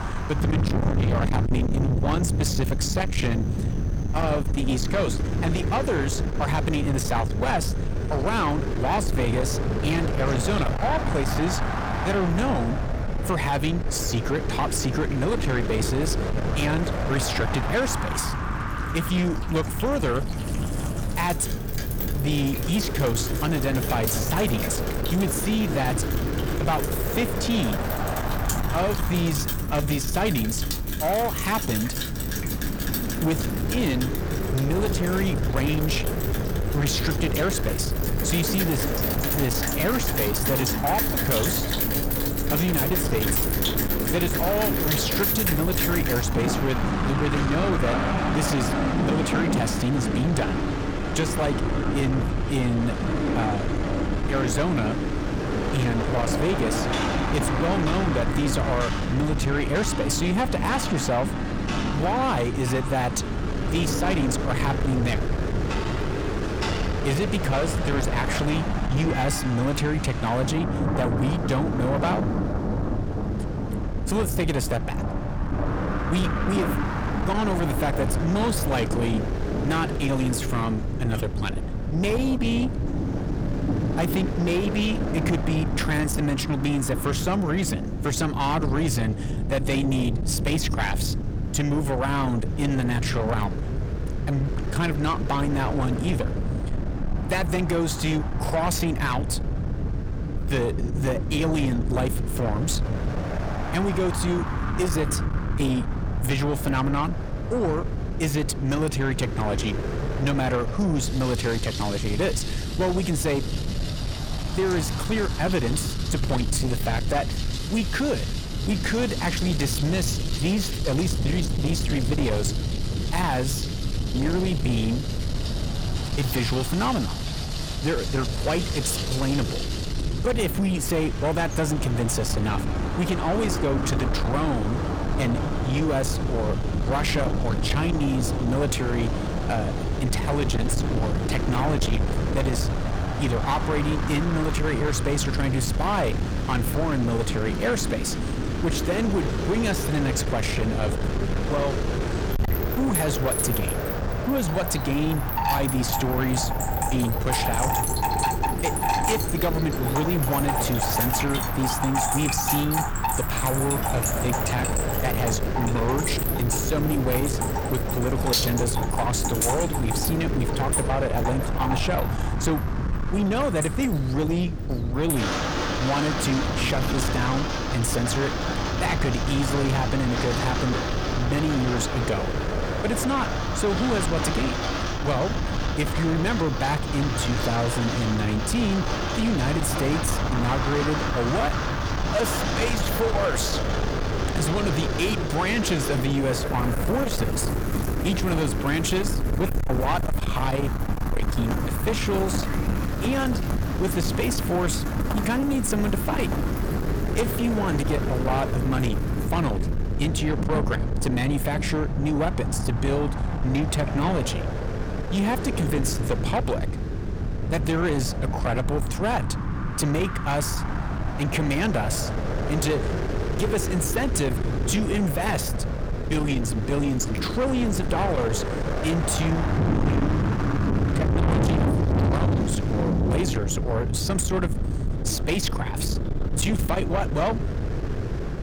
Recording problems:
distortion; heavy; 7 dB below the speech
wind noise on the microphone; heavy; 6 dB below the speech
rain or running water; loud; throughout; 4 dB below the speech
low rumble; noticeable; throughout; 10 dB below the speech

